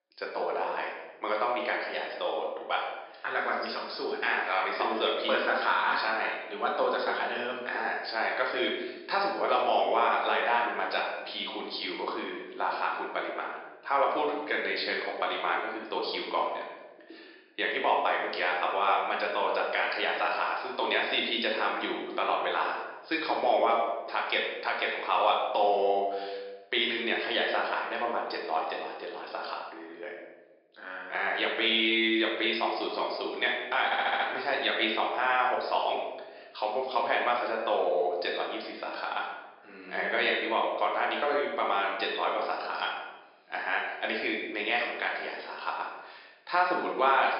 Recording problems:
thin; very; fading below 300 Hz
room echo; noticeable; dies away in 1 s
high frequencies cut off; noticeable; nothing above 5.5 kHz
off-mic speech; somewhat distant
audio stuttering; at 34 s

